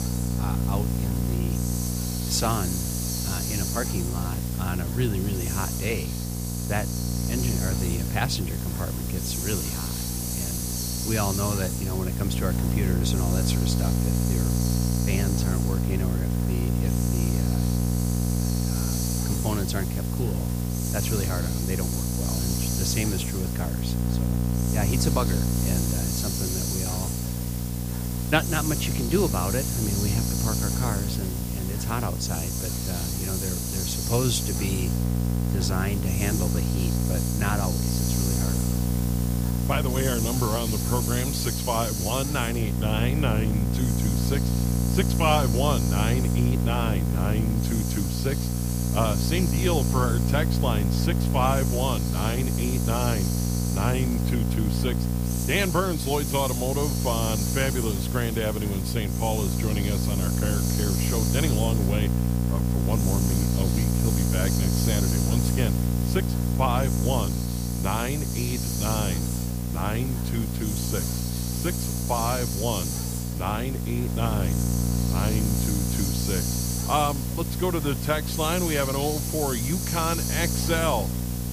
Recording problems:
electrical hum; loud; throughout; 60 Hz, 5 dB below the speech
hiss; loud; throughout; 3 dB below the speech

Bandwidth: 15 kHz